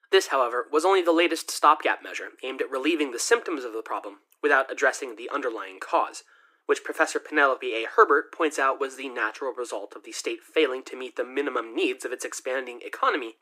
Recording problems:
thin; very; fading below 300 Hz

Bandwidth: 15.5 kHz